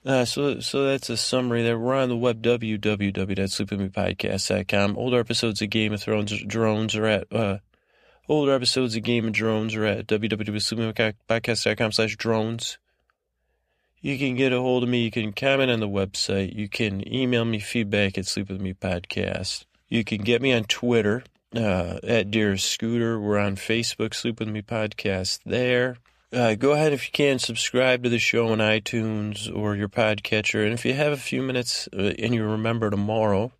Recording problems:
none

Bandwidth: 14.5 kHz